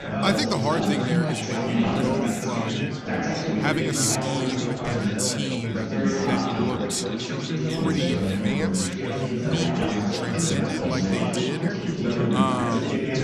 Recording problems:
chatter from many people; very loud; throughout; 3 dB above the speech

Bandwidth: 15 kHz